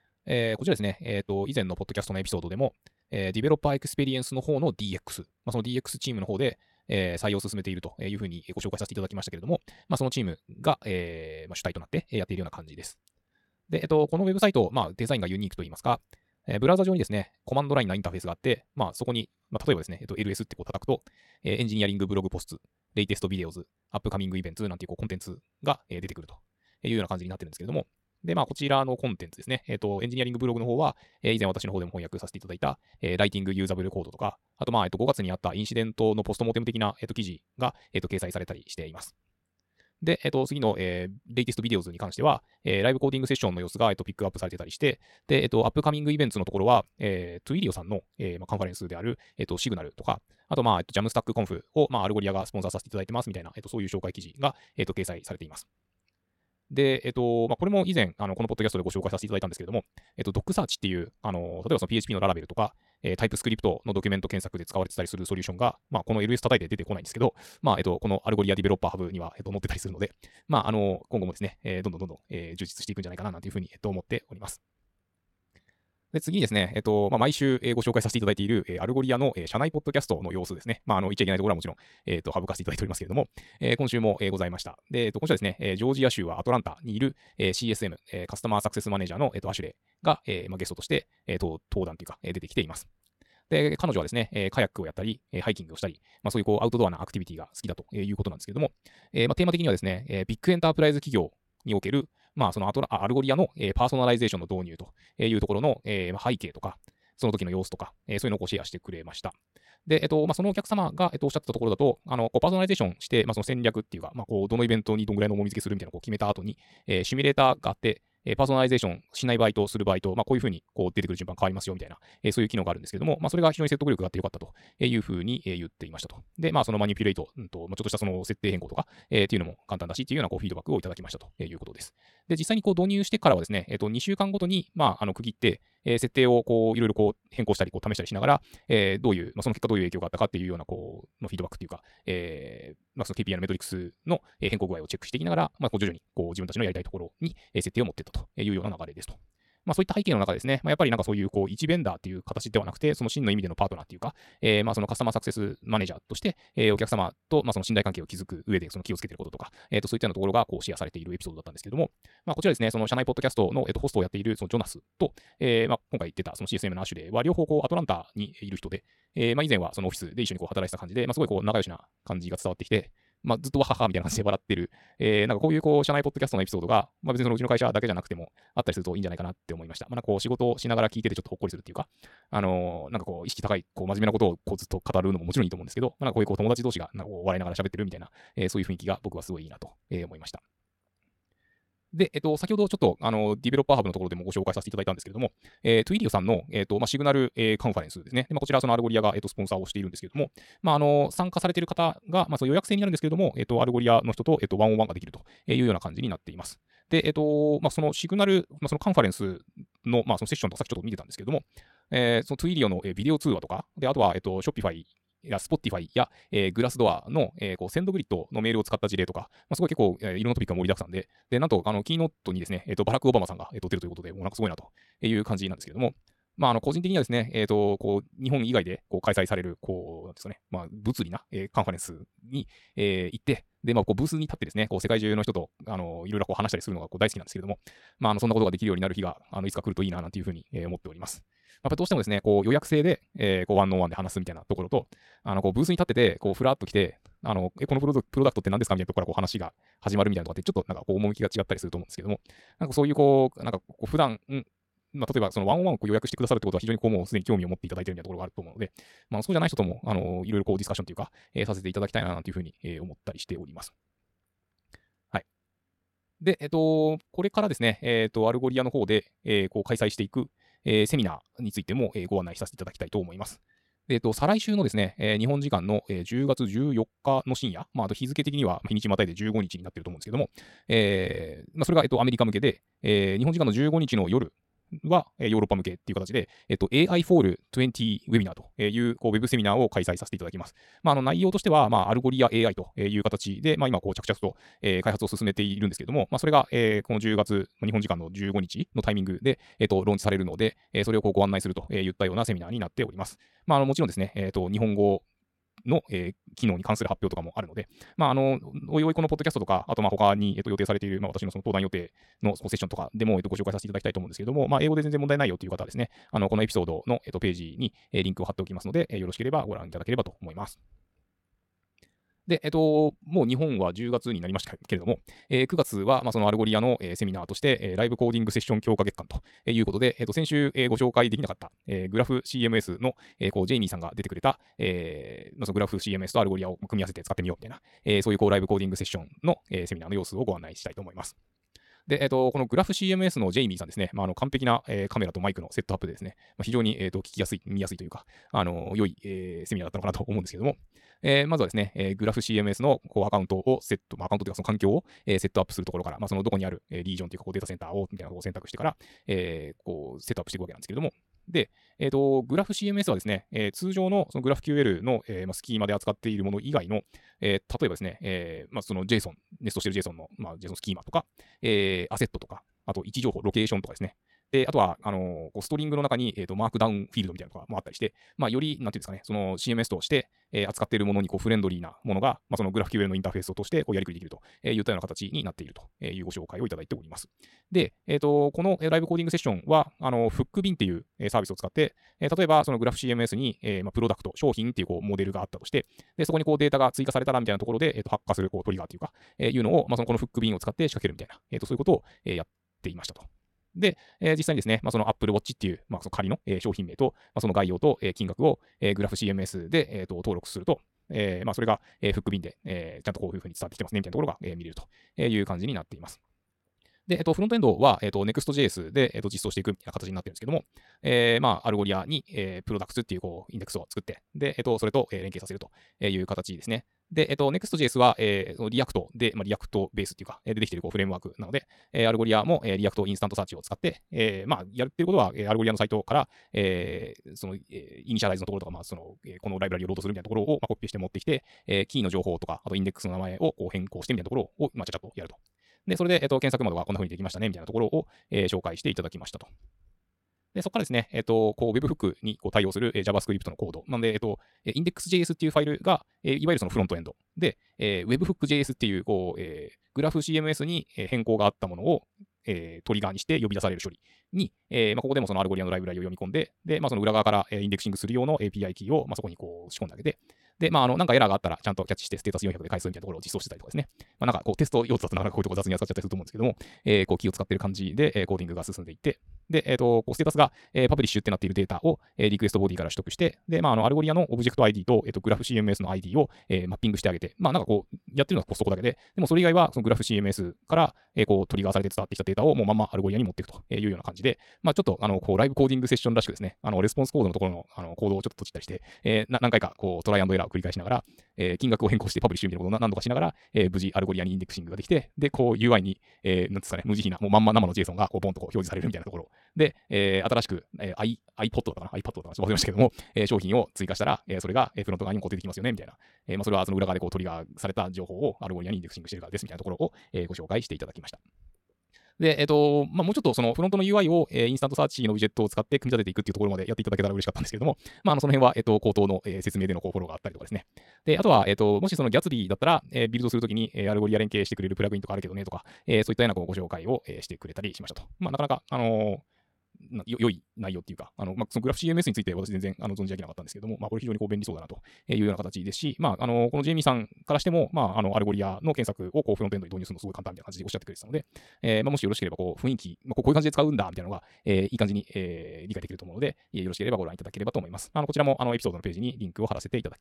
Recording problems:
wrong speed, natural pitch; too fast; 1.7 times normal speed

